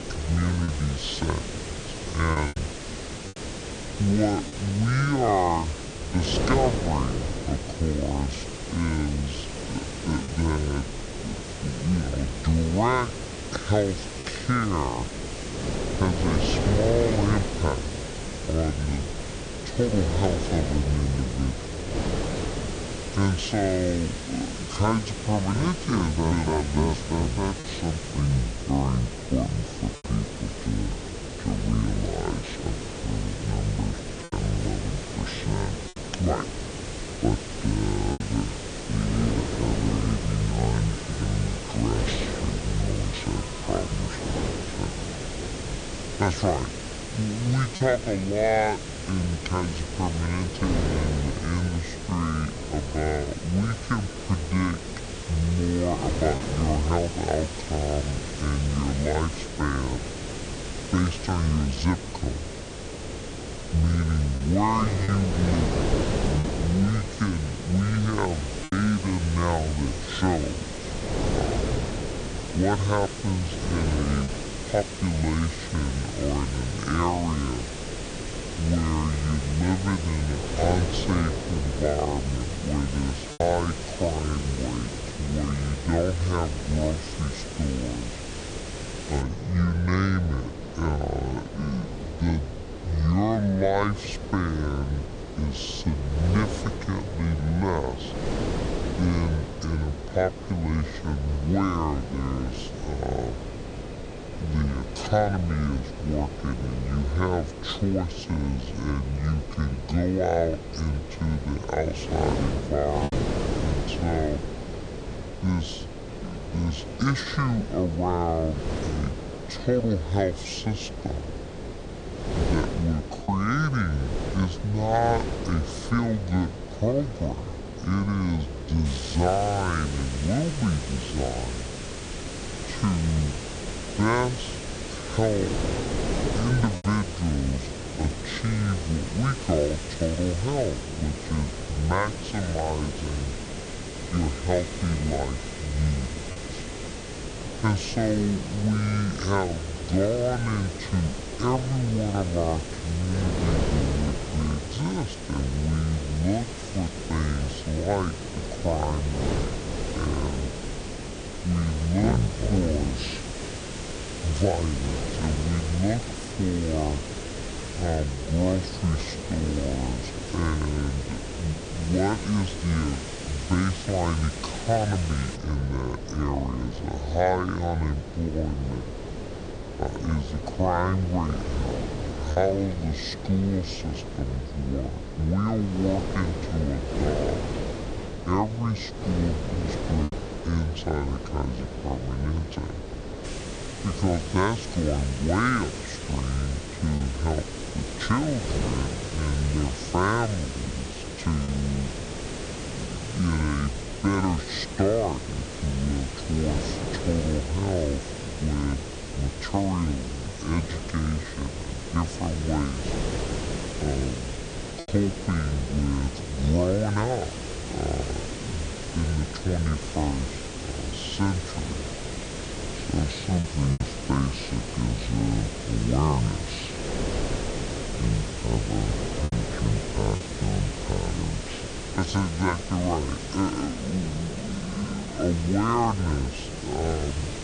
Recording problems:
wrong speed and pitch; too slow and too low; 0.6 times normal speed
wind noise on the microphone; heavy; 7 dB below the speech
hiss; noticeable; until 1:29, from 2:09 to 2:55 and from 3:13 on; 10 dB below the speech
alarms or sirens; faint; throughout; 30 dB below the speech
choppy; occasionally; 1% of the speech affected

